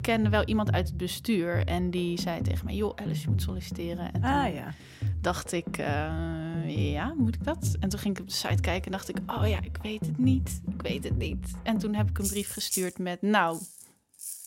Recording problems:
background music; loud; throughout; 2 dB below the speech

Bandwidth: 16 kHz